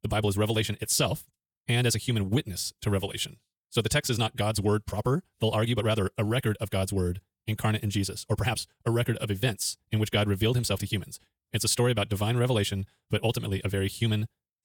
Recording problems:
wrong speed, natural pitch; too fast; 1.5 times normal speed

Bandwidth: 18.5 kHz